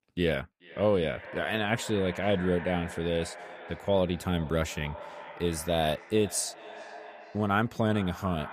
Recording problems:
echo of what is said; noticeable; throughout; 430 ms later, 15 dB below the speech

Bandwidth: 14.5 kHz